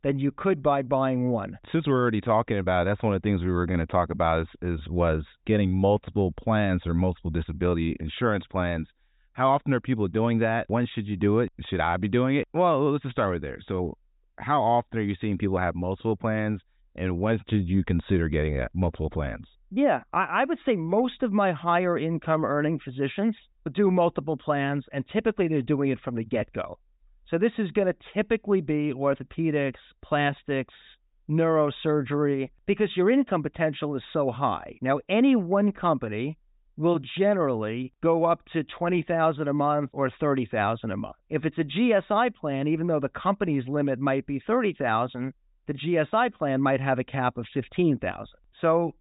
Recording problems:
high frequencies cut off; severe; nothing above 4 kHz

